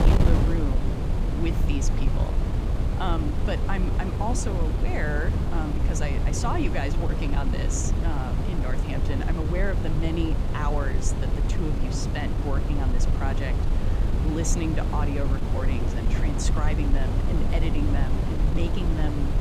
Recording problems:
wind noise on the microphone; heavy; 2 dB below the speech

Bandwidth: 15.5 kHz